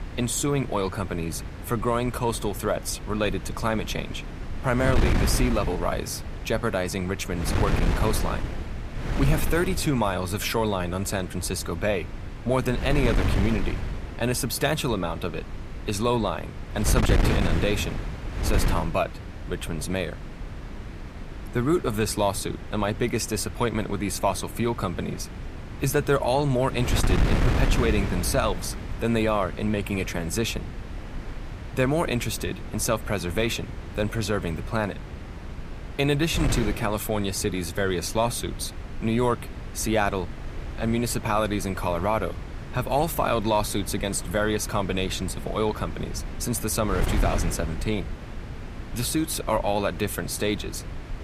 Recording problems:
wind noise on the microphone; occasional gusts; 10 dB below the speech

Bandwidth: 14.5 kHz